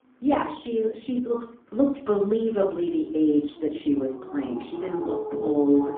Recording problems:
phone-call audio; poor line
off-mic speech; far
room echo; slight; dies away in 0.4 s
animal sounds; loud; throughout; 8 dB below the speech

